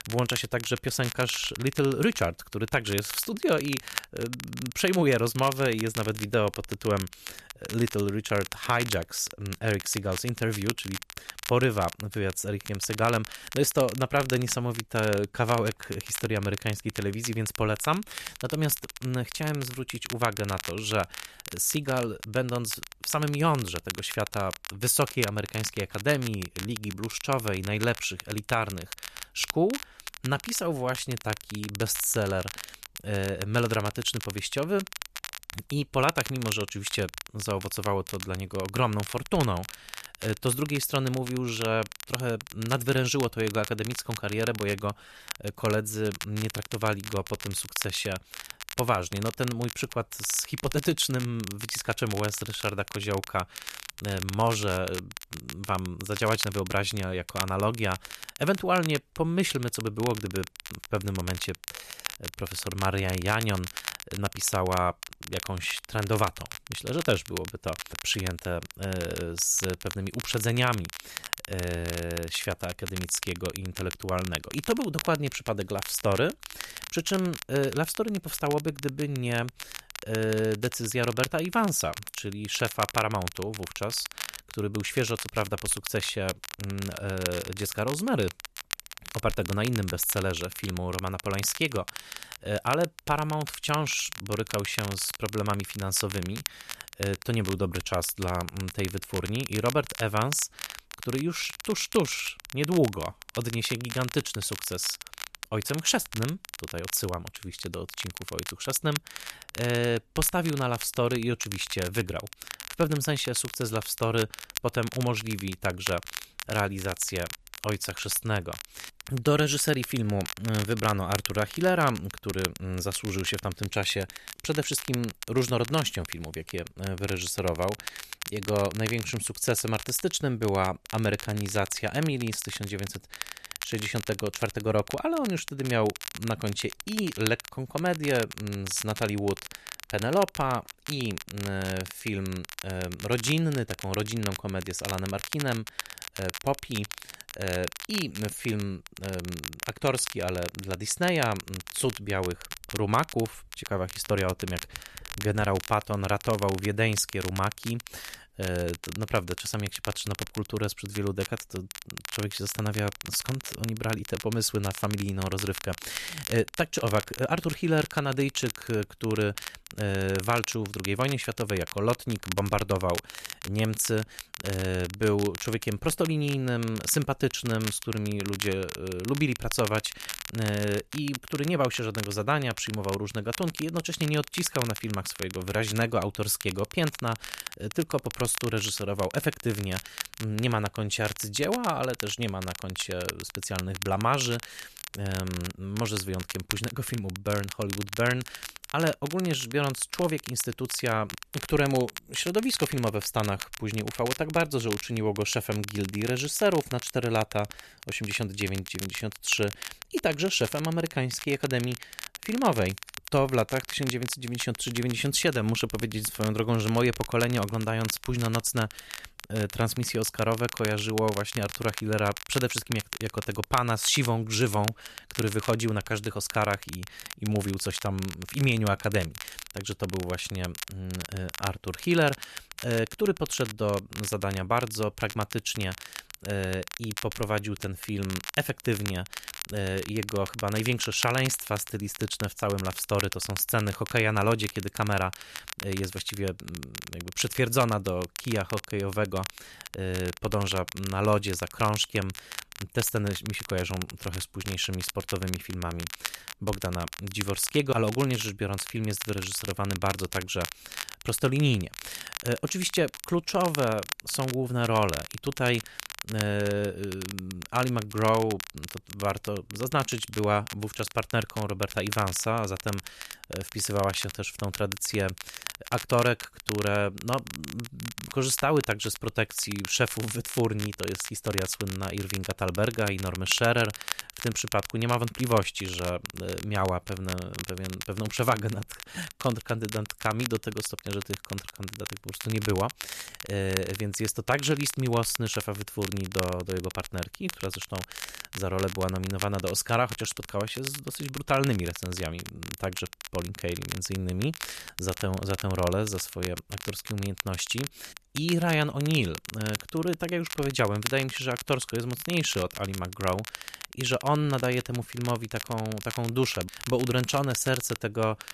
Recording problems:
crackle, like an old record; loud; 9 dB below the speech

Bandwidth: 14 kHz